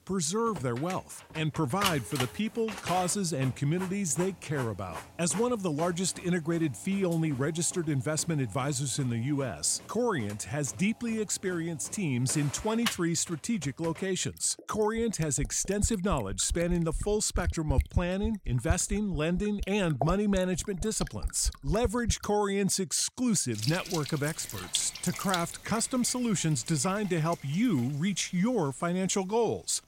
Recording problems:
household noises; loud; throughout; 10 dB below the speech

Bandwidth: 16 kHz